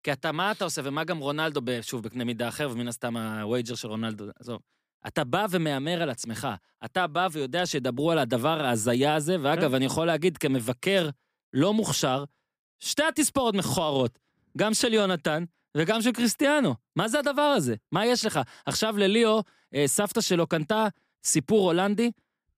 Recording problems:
none

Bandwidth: 15 kHz